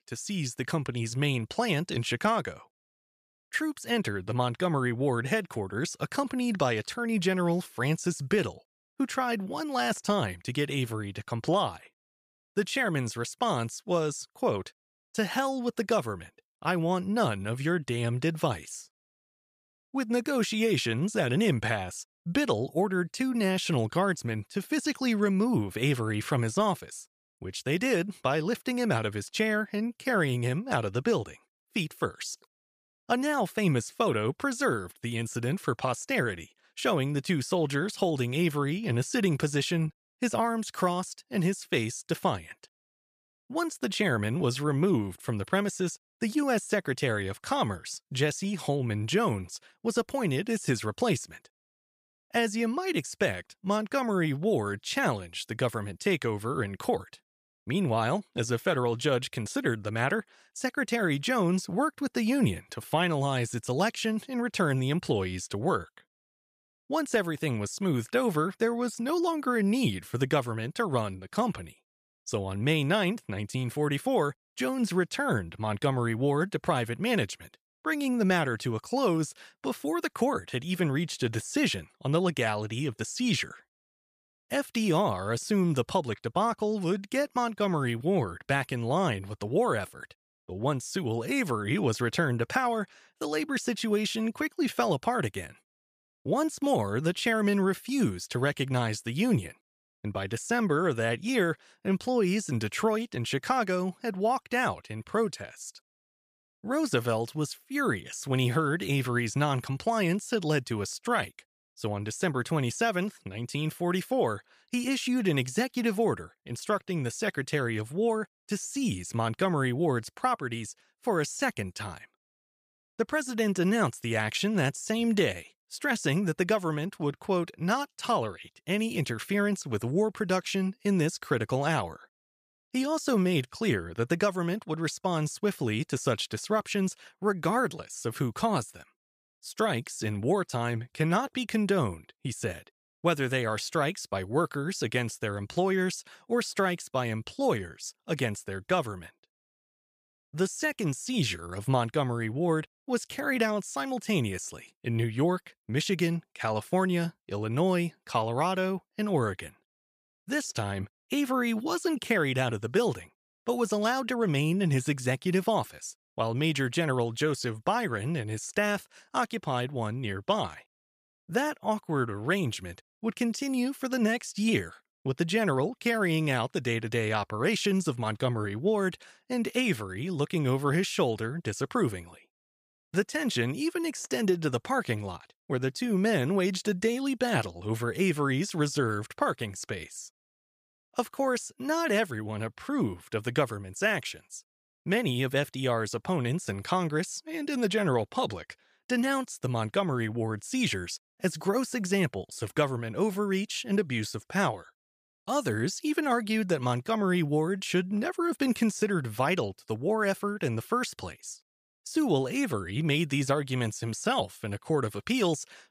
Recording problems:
none

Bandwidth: 15 kHz